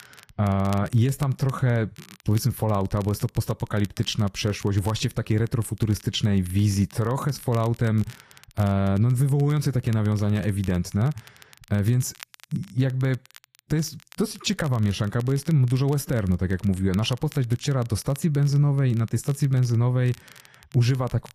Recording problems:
garbled, watery; slightly; nothing above 14.5 kHz
crackle, like an old record; faint; 25 dB below the speech

